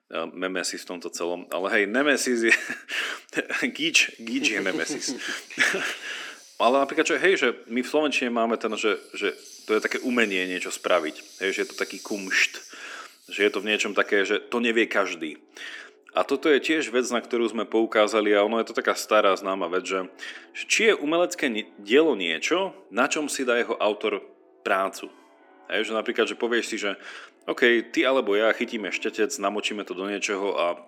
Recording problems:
thin; somewhat; fading below 250 Hz
background music; faint; throughout; 25 dB below the speech

